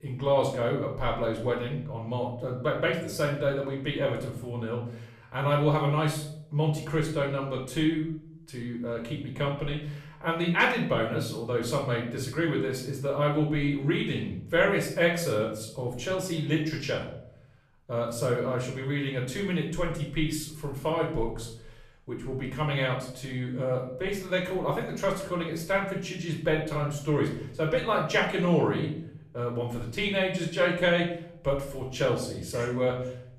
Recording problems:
off-mic speech; far
room echo; noticeable; dies away in 0.6 s

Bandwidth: 14.5 kHz